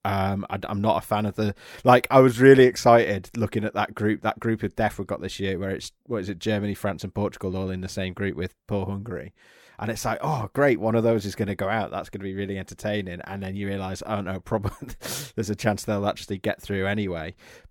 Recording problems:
none

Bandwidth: 17.5 kHz